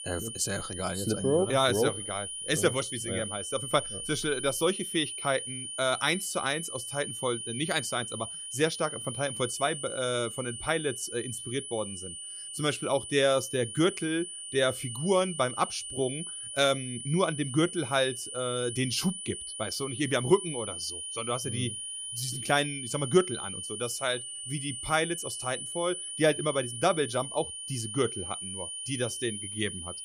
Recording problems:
high-pitched whine; loud; throughout; 9.5 kHz, 6 dB below the speech

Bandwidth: 15 kHz